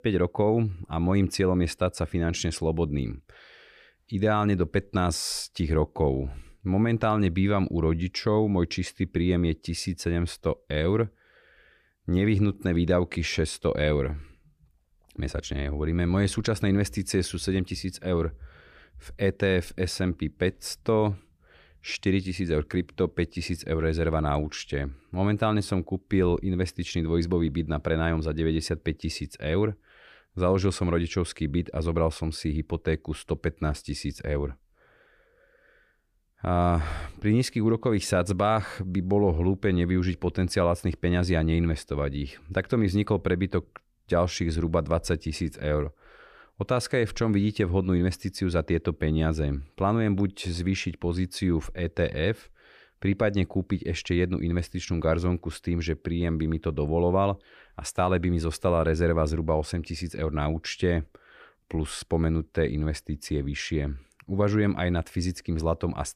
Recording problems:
none

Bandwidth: 15 kHz